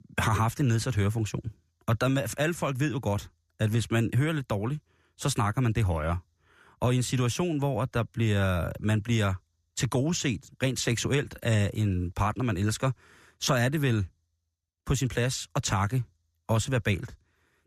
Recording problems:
none

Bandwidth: 14.5 kHz